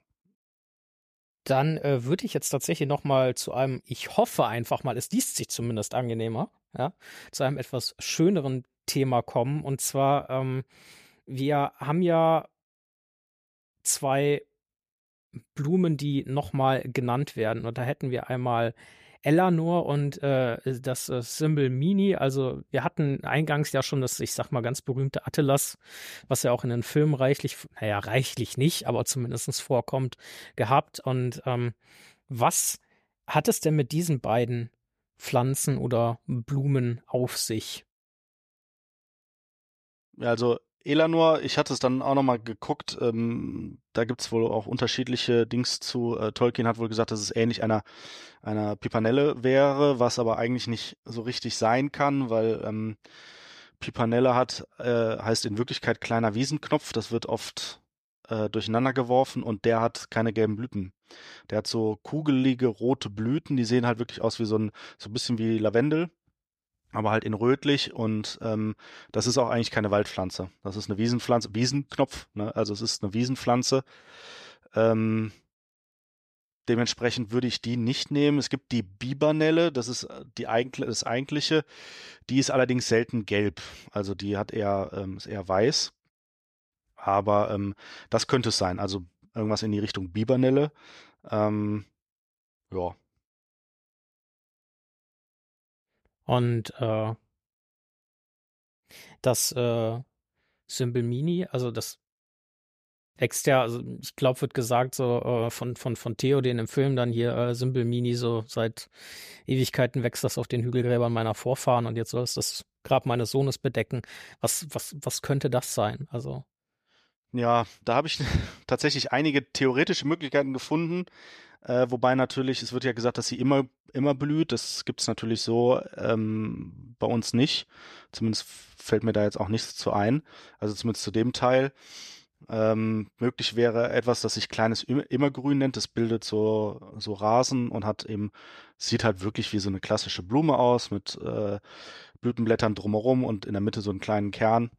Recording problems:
none

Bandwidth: 14.5 kHz